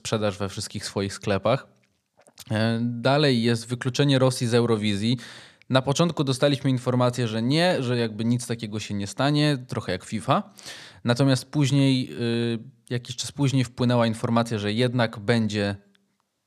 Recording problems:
none

